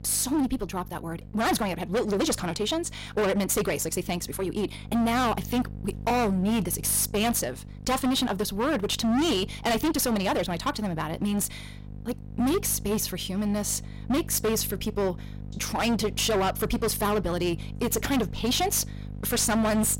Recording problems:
distortion; heavy; 18% of the sound clipped
wrong speed, natural pitch; too fast; 1.5 times normal speed
electrical hum; faint; throughout; 50 Hz, 25 dB below the speech

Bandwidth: 16 kHz